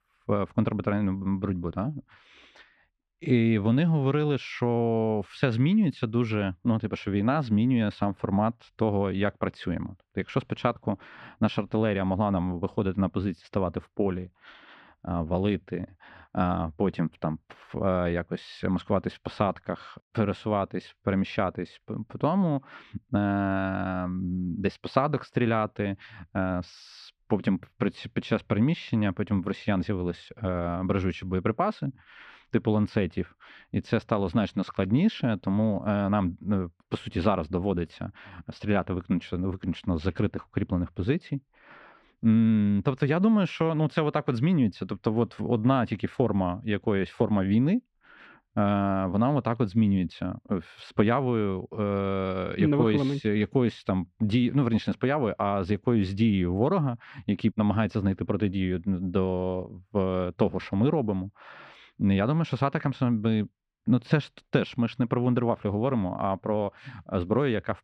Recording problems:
muffled; slightly; fading above 2.5 kHz

